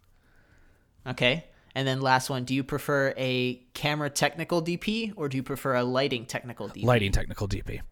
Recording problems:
none

